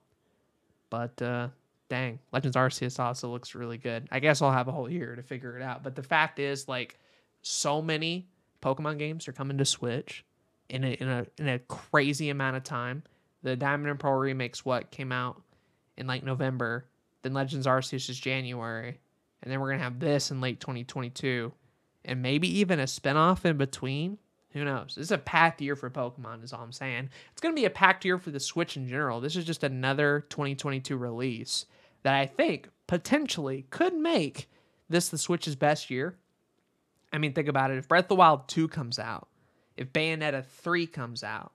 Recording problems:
uneven, jittery; strongly; from 2.5 to 14 s

